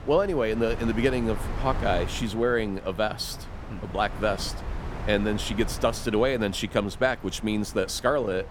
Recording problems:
wind noise on the microphone; occasional gusts; 15 dB below the speech

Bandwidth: 18 kHz